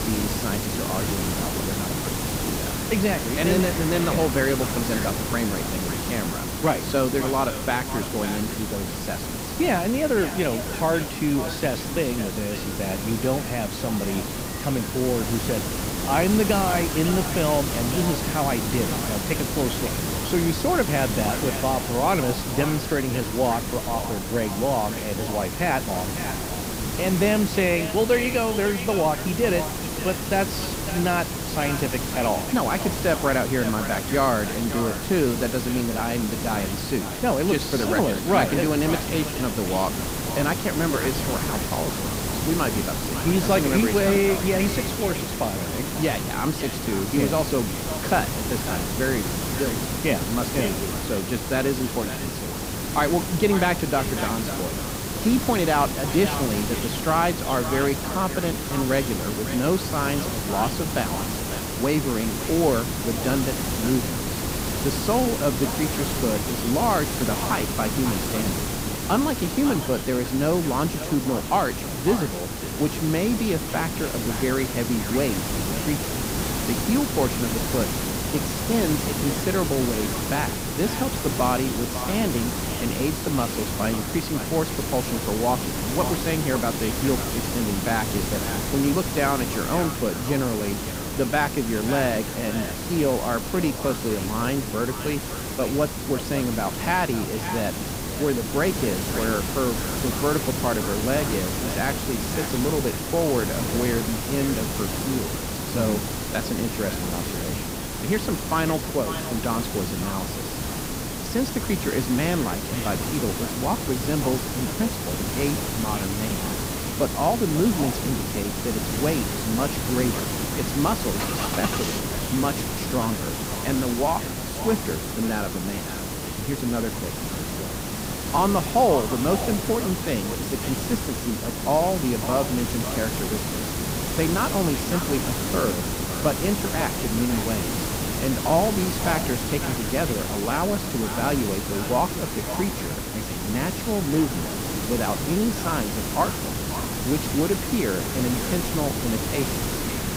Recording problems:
echo of what is said; noticeable; throughout; 550 ms later, 15 dB below the speech
hiss; loud; throughout; 2 dB below the speech
electrical hum; faint; throughout; 60 Hz, 30 dB below the speech
traffic noise; faint; throughout; 20 dB below the speech

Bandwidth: 15.5 kHz